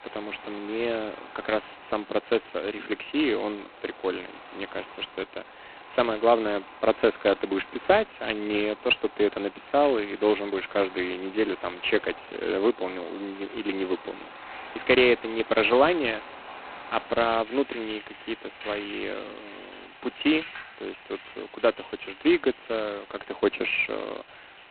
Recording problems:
phone-call audio; poor line; nothing above 4 kHz
rain or running water; noticeable; throughout; 20 dB below the speech
hiss; faint; throughout; 25 dB below the speech

